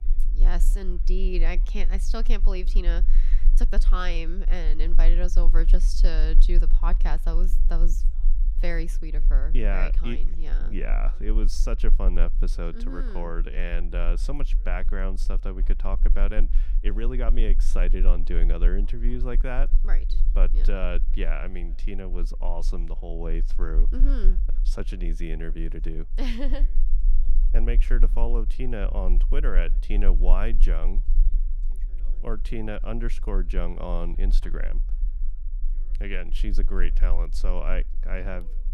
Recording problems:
low rumble; noticeable; throughout; 20 dB below the speech
voice in the background; faint; throughout; 30 dB below the speech

